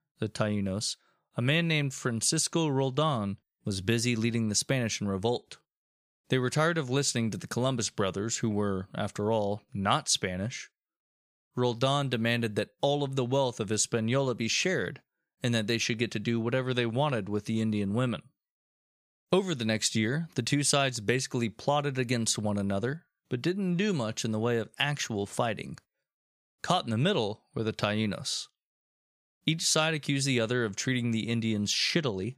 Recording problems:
none

